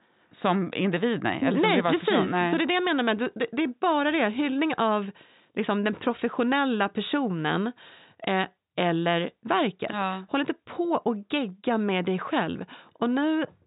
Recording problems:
high frequencies cut off; severe; nothing above 4 kHz

